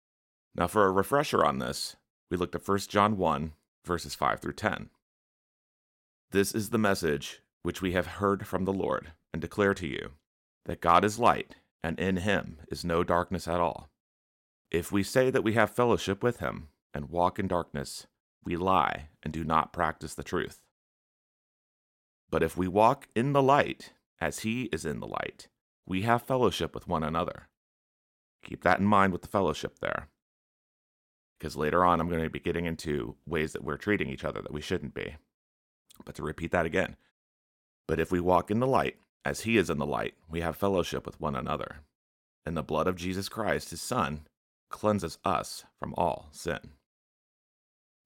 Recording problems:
none

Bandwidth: 16.5 kHz